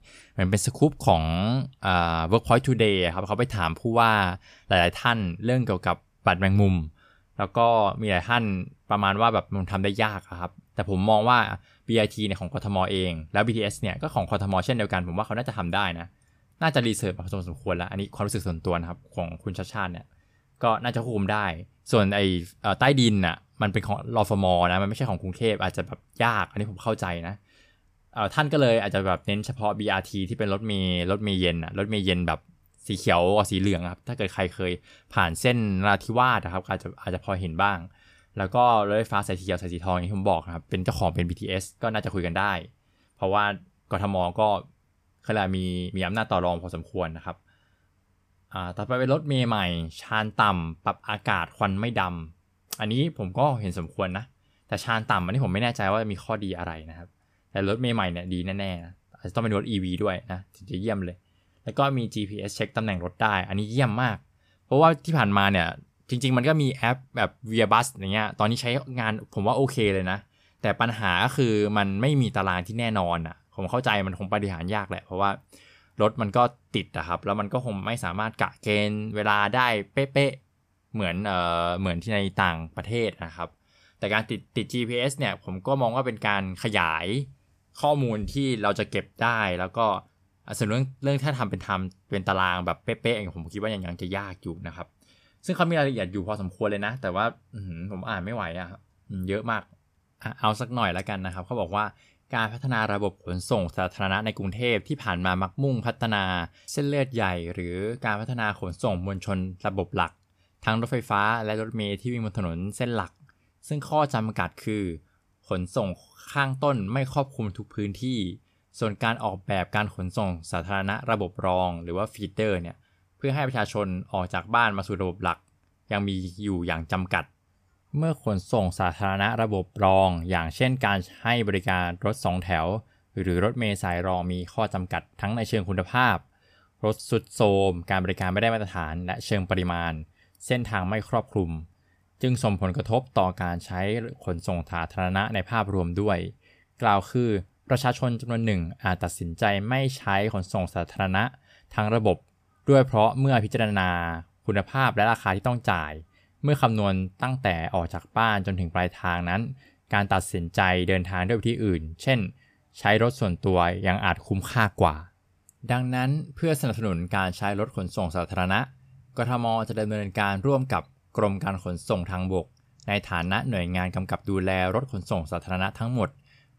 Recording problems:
none

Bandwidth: 14.5 kHz